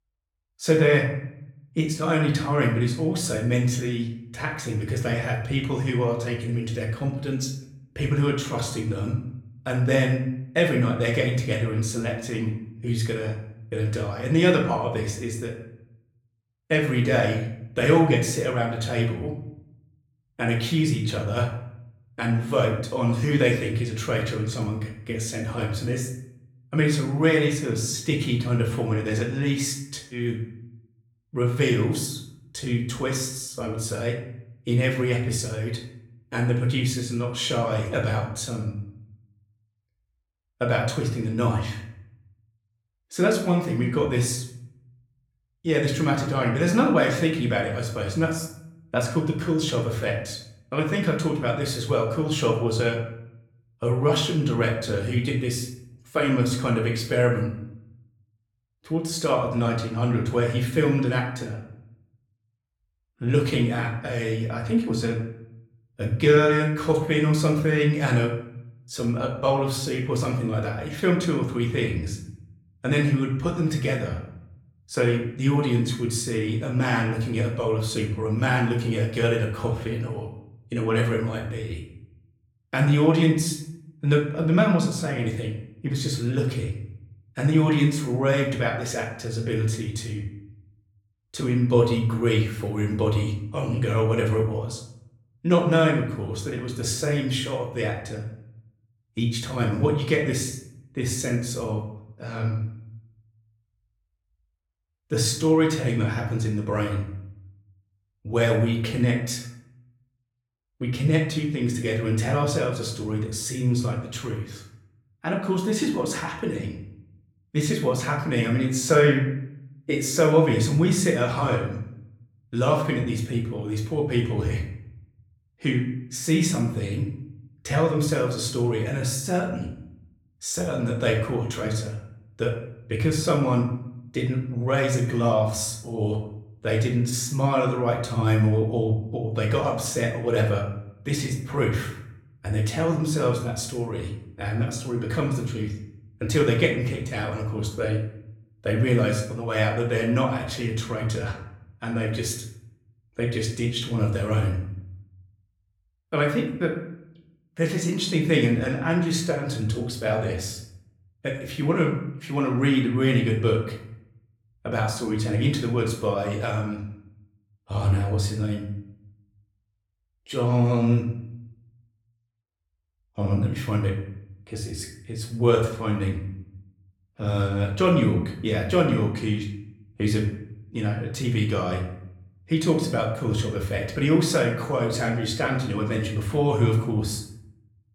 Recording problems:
room echo; slight; dies away in 0.6 s
off-mic speech; somewhat distant

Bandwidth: 18.5 kHz